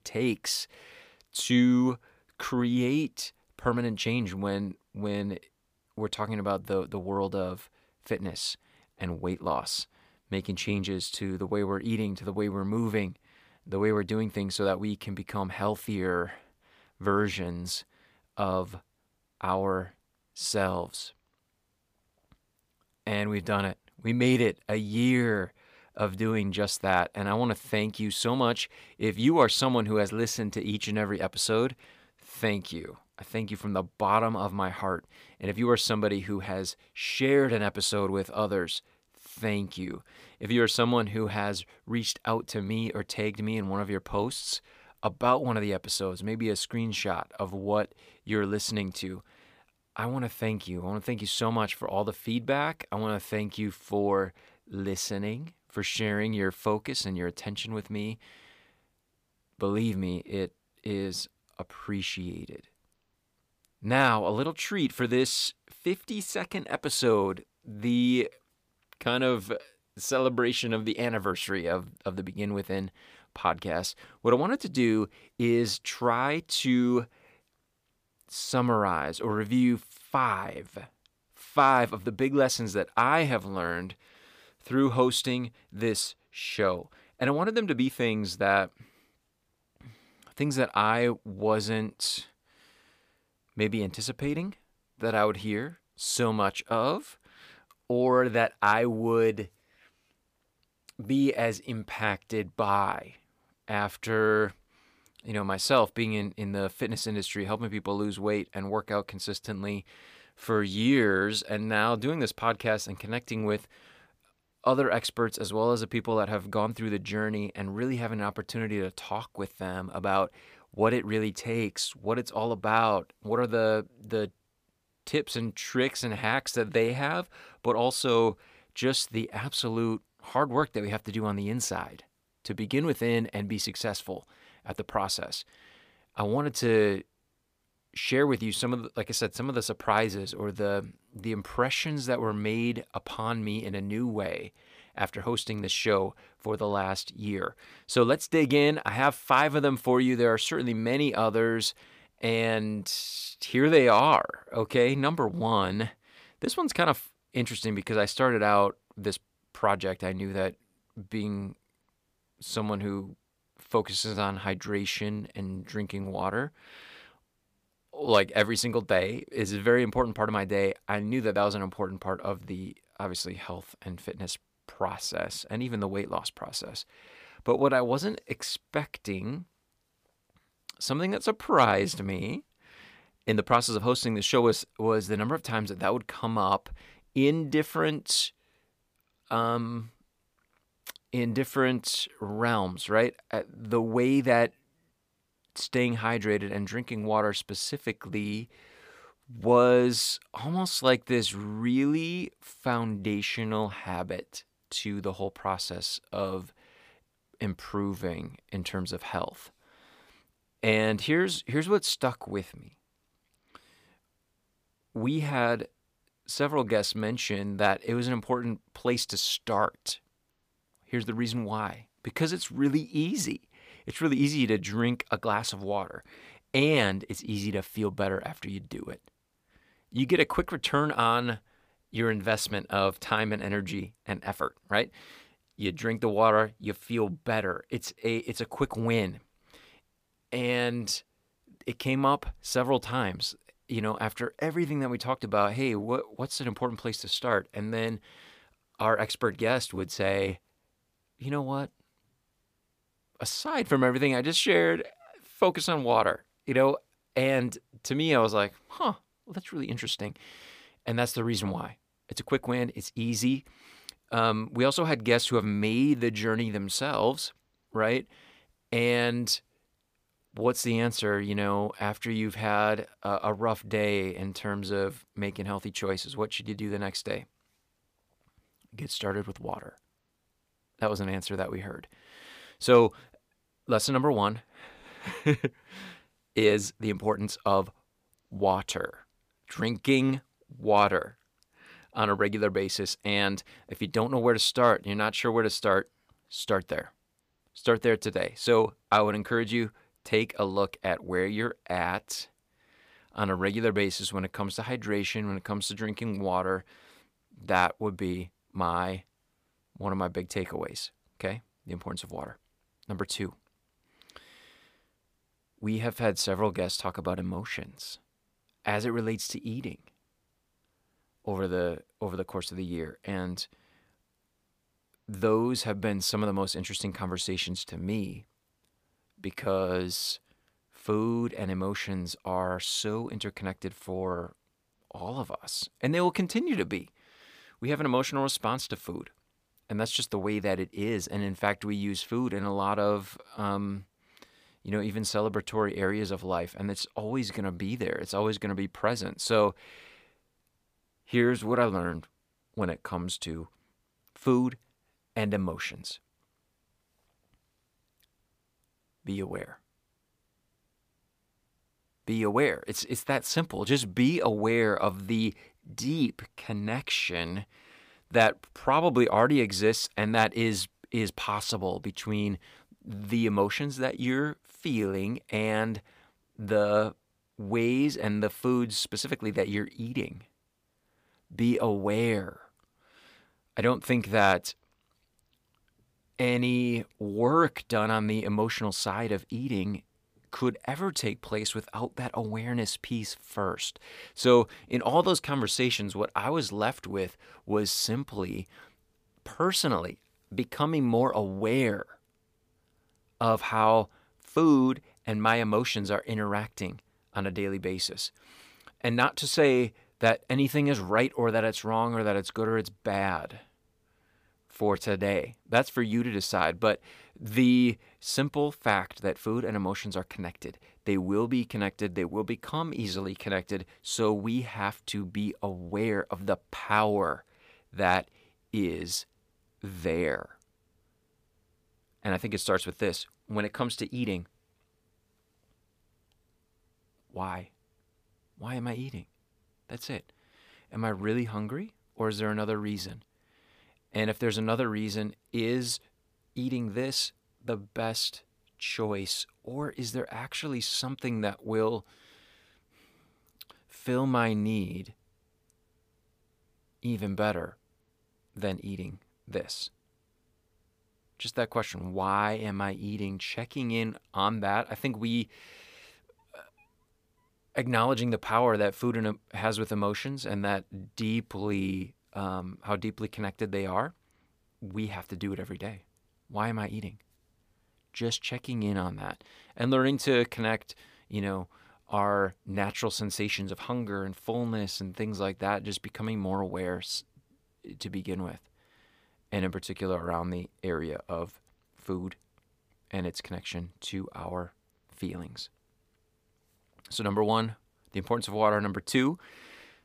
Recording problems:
none

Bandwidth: 15 kHz